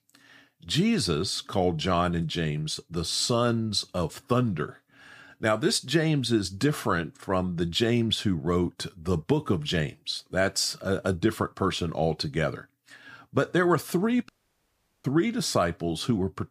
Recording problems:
audio cutting out; at 14 s for 1 s

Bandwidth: 15 kHz